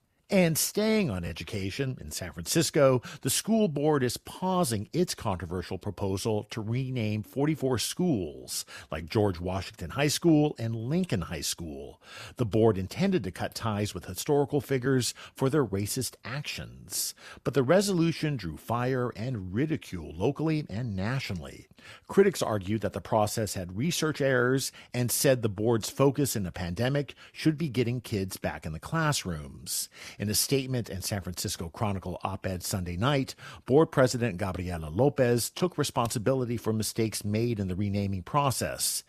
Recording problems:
none

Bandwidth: 14.5 kHz